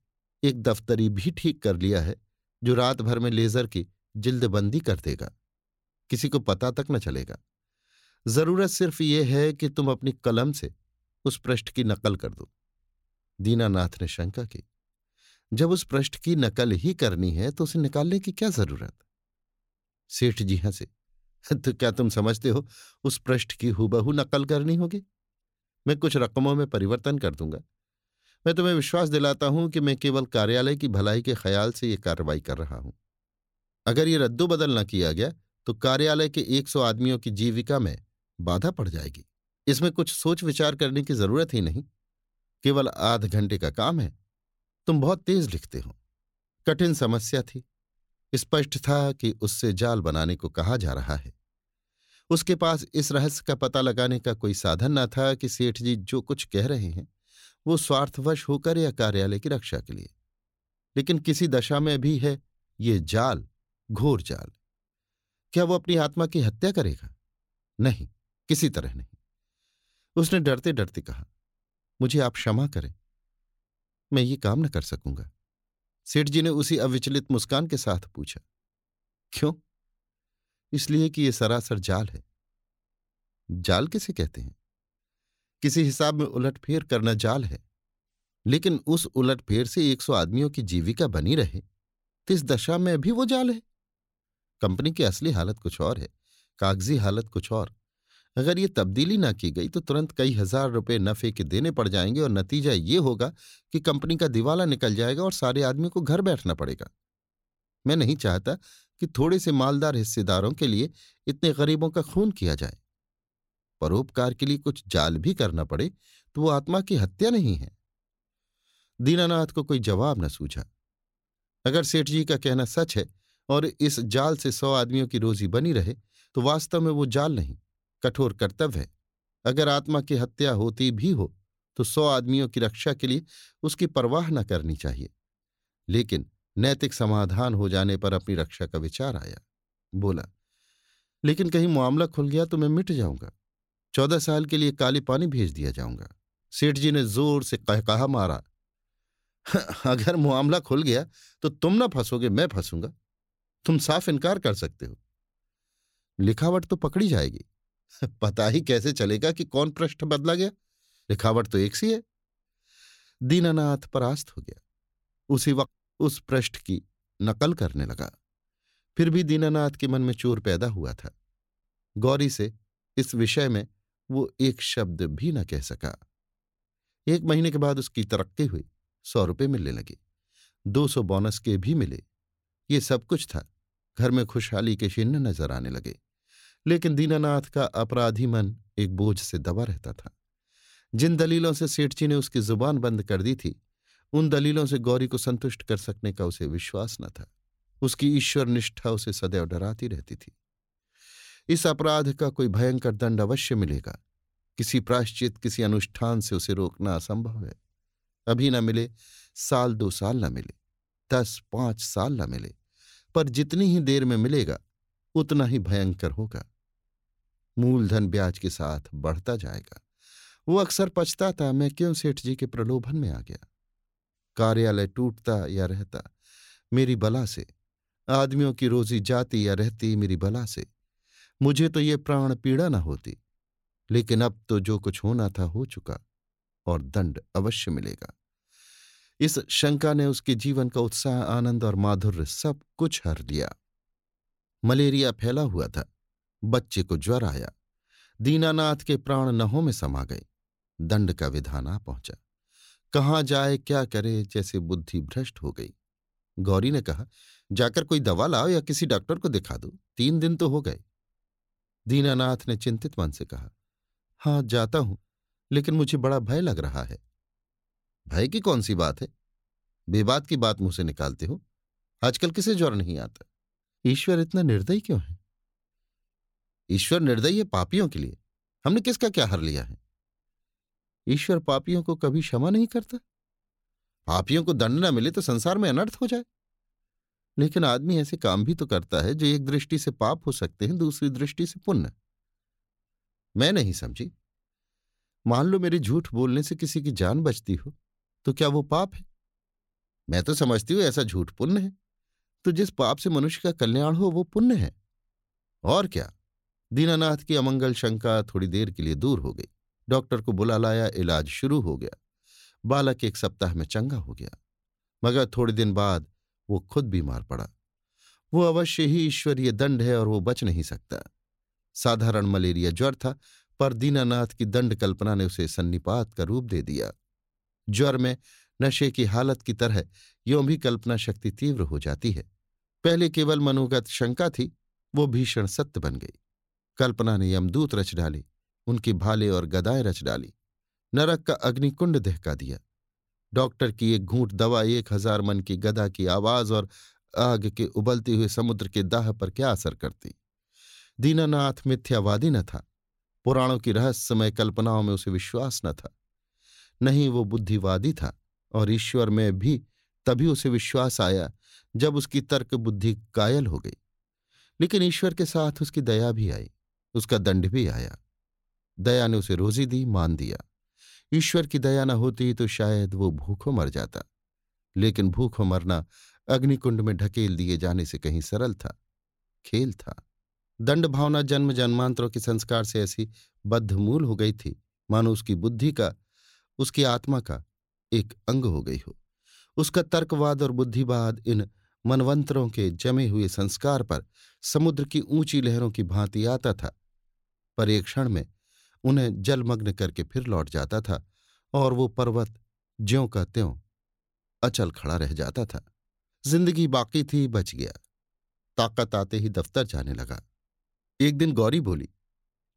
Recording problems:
none

